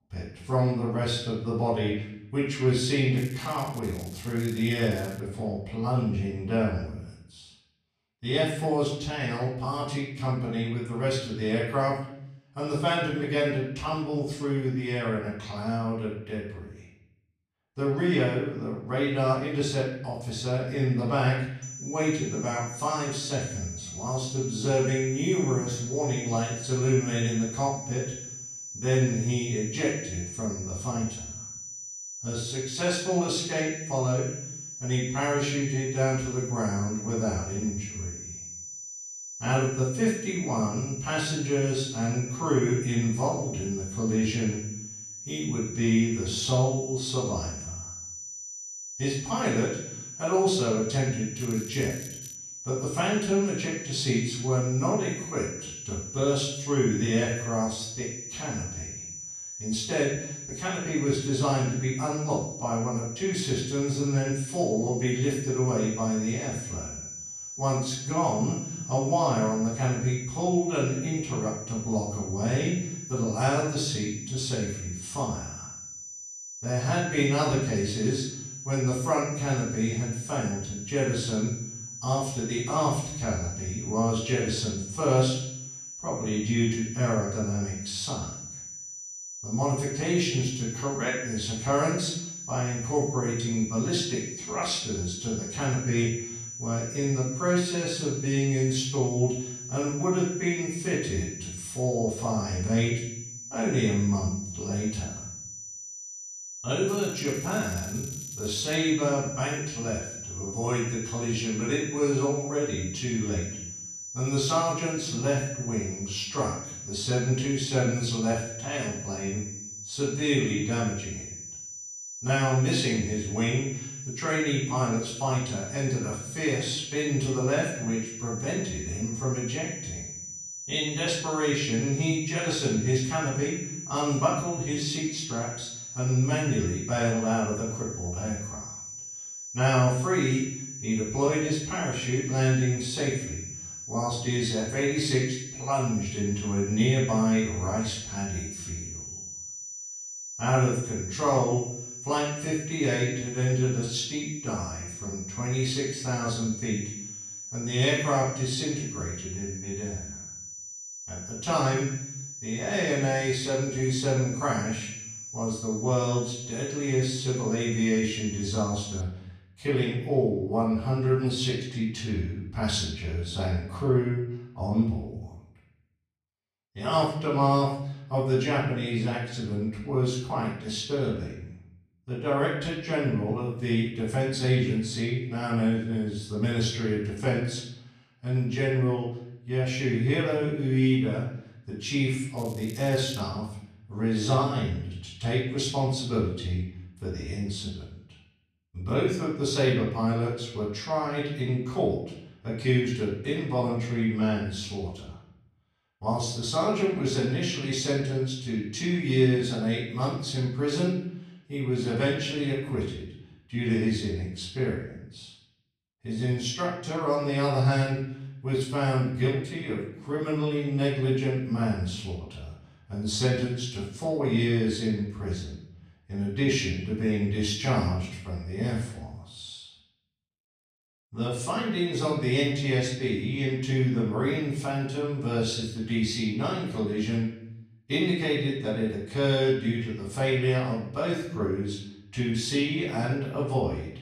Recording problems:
off-mic speech; far
room echo; noticeable; dies away in 0.7 s
high-pitched whine; loud; from 22 s to 2:49; 6 kHz, 9 dB below the speech
crackling; noticeable; 4 times, first at 3 s; 20 dB below the speech

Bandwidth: 14 kHz